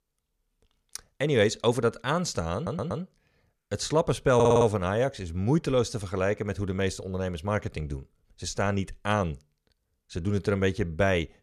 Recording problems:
audio stuttering; at 2.5 s and at 4.5 s

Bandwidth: 14.5 kHz